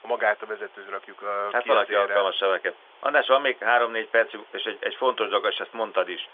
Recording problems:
phone-call audio; nothing above 3.5 kHz
hiss; faint; throughout; 25 dB below the speech

